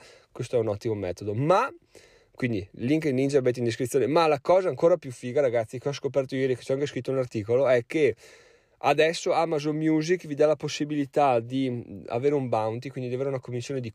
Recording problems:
none

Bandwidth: 14.5 kHz